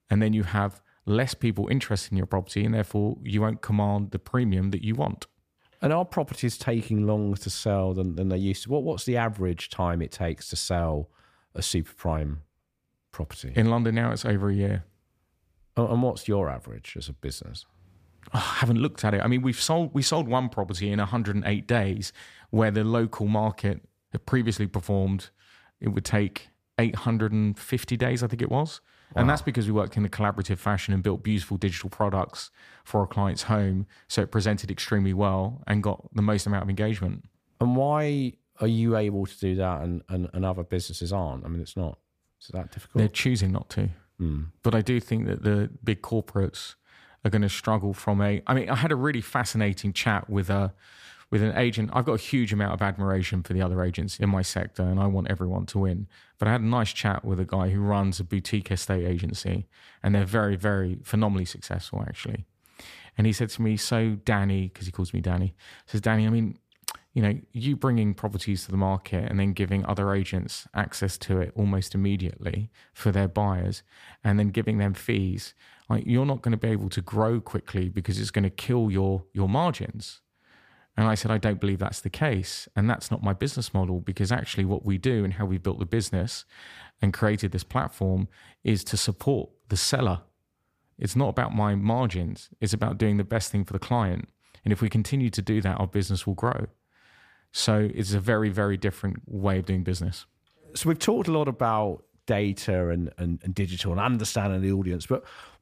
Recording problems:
none

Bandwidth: 15 kHz